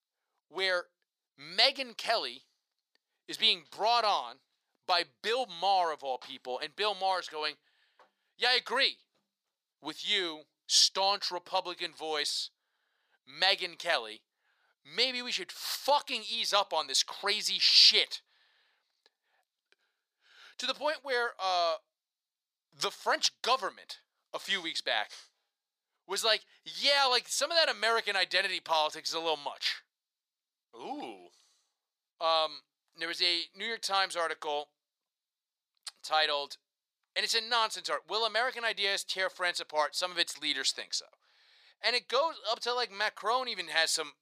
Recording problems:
thin; very; fading below 750 Hz

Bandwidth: 15 kHz